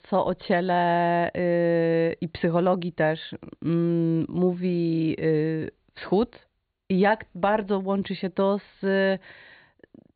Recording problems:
high frequencies cut off; severe; nothing above 4.5 kHz

